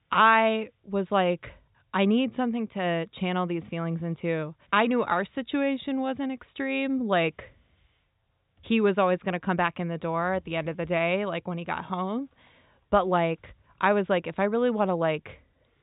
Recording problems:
high frequencies cut off; severe; nothing above 4 kHz

